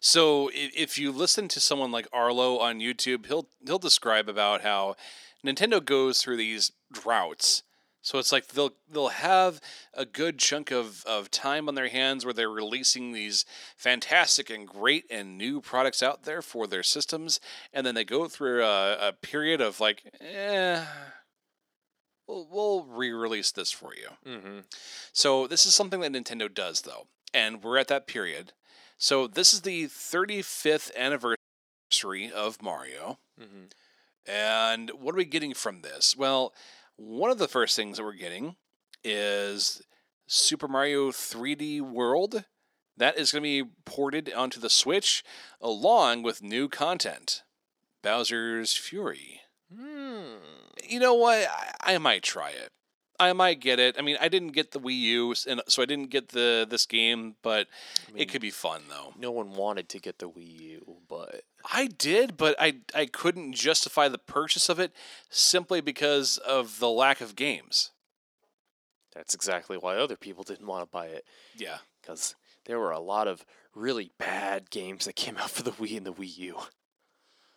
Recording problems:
thin; somewhat; fading below 400 Hz
audio cutting out; at 31 s for 0.5 s

